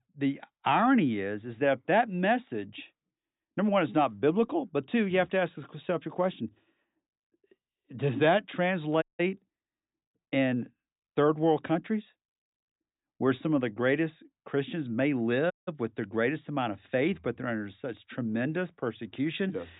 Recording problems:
high frequencies cut off; severe; nothing above 4 kHz
audio cutting out; at 9 s and at 16 s

